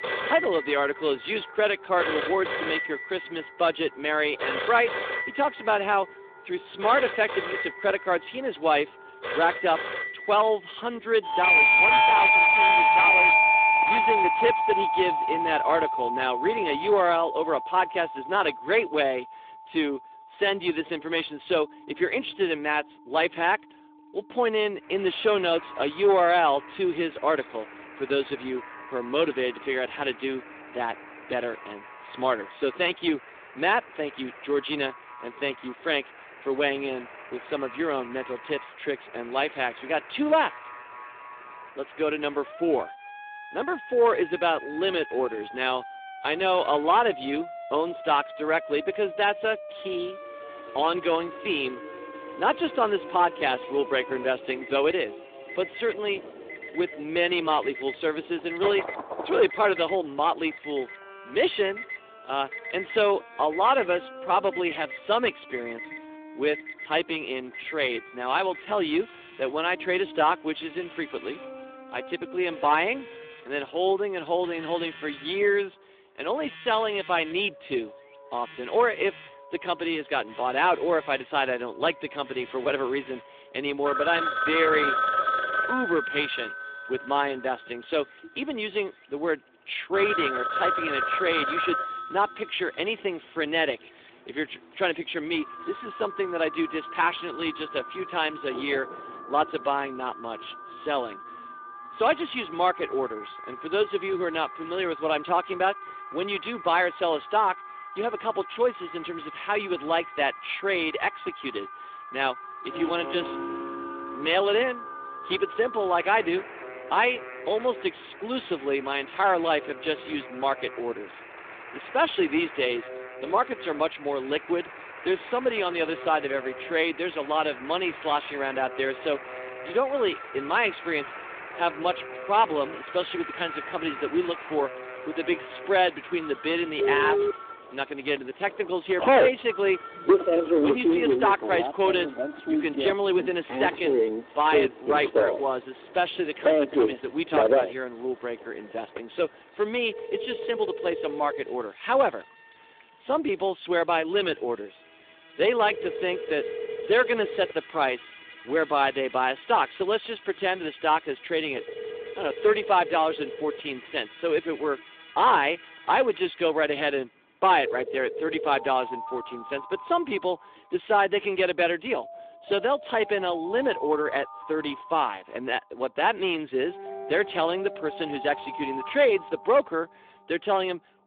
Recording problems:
phone-call audio; nothing above 3.5 kHz
distortion; slight; 2% of the sound clipped
alarms or sirens; loud; throughout; 2 dB below the speech
background music; noticeable; throughout; 20 dB below the speech
rain or running water; faint; throughout; 25 dB below the speech

